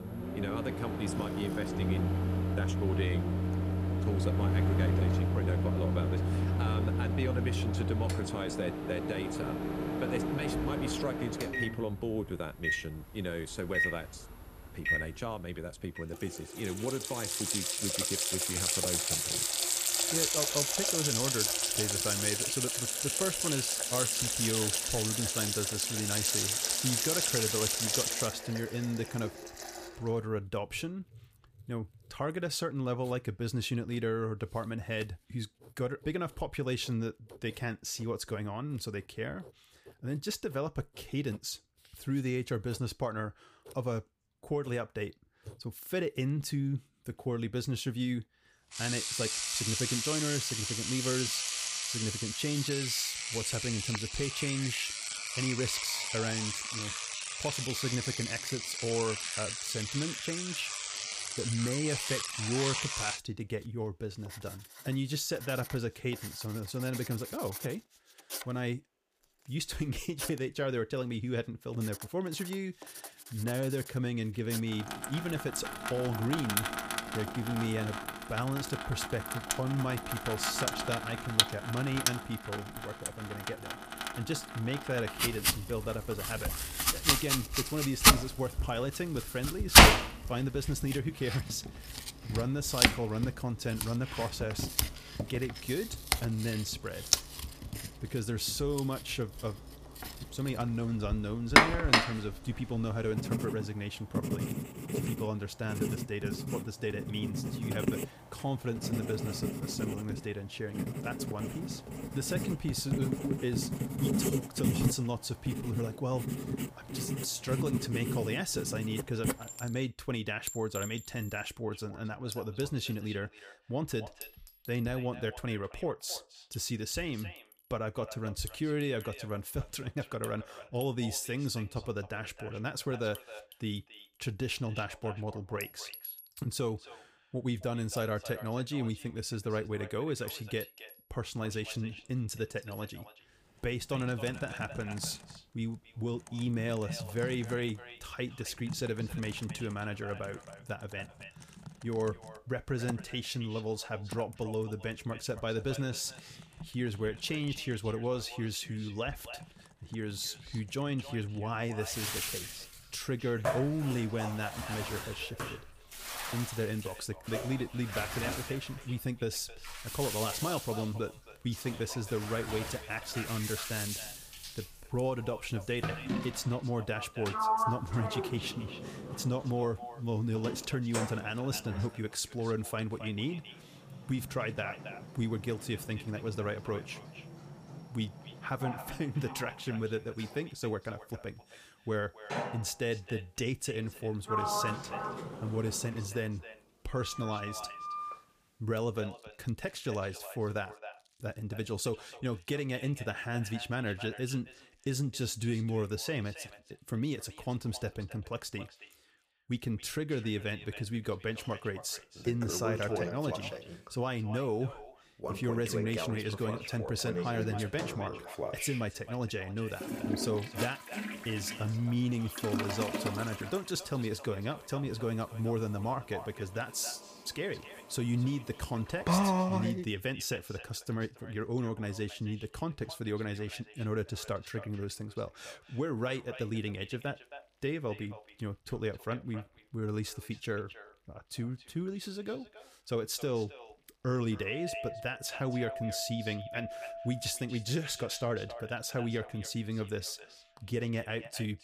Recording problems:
echo of what is said; noticeable; from 2:02 on; 270 ms later, 15 dB below the speech
household noises; very loud; throughout; 3 dB above the speech

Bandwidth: 15 kHz